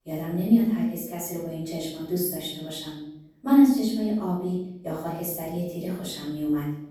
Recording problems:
off-mic speech; far
room echo; noticeable; dies away in 0.7 s

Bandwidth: 18.5 kHz